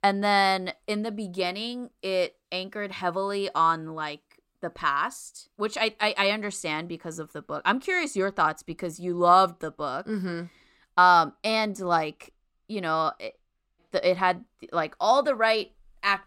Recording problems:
none

